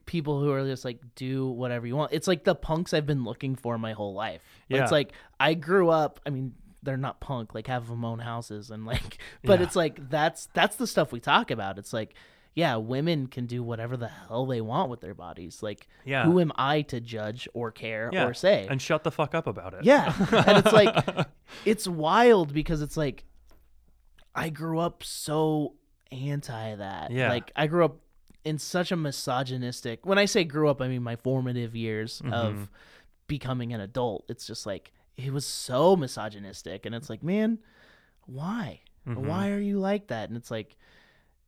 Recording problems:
none

